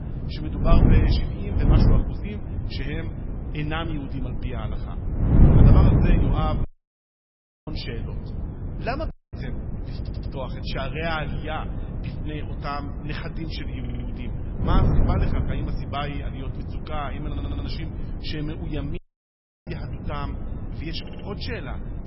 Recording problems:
garbled, watery; badly; nothing above 5.5 kHz
echo of what is said; faint; throughout; 110 ms later, 20 dB below the speech
wind noise on the microphone; heavy; 2 dB below the speech
audio cutting out; at 6.5 s for 1 s, at 9 s and at 19 s for 0.5 s
audio stuttering; 4 times, first at 10 s

